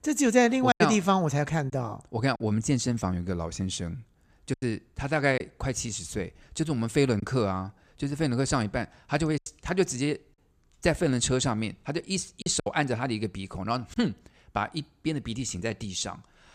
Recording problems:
choppy; occasionally; 4% of the speech affected

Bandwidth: 14.5 kHz